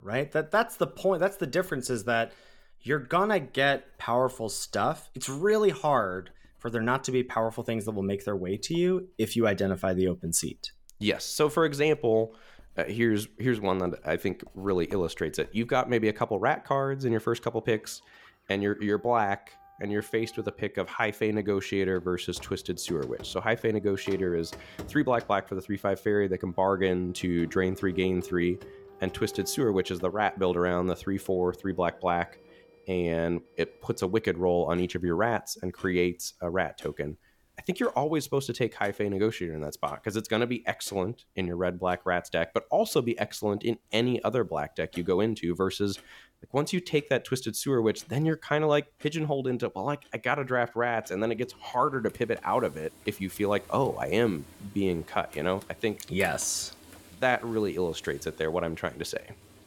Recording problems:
household noises; faint; throughout; 25 dB below the speech

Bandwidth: 17.5 kHz